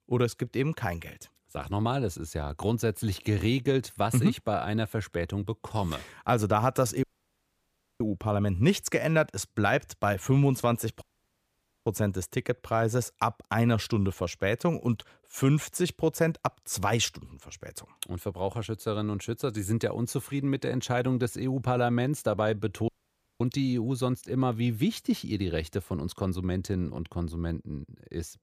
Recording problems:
audio cutting out; at 7 s for 1 s, at 11 s for 1 s and at 23 s for 0.5 s

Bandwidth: 15 kHz